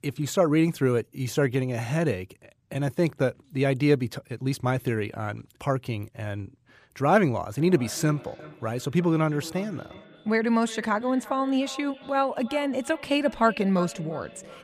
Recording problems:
echo of what is said; faint; from 7.5 s on; 350 ms later, 20 dB below the speech

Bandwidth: 14.5 kHz